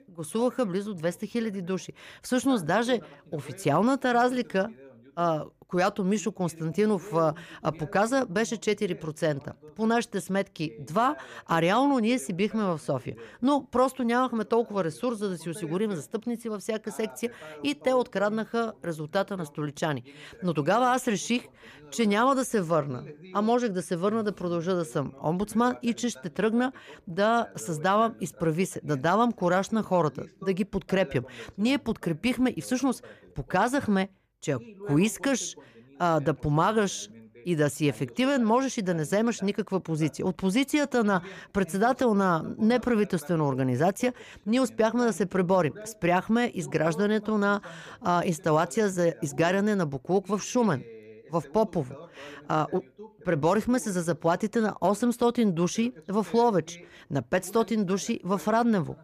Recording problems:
voice in the background; faint; throughout; 20 dB below the speech

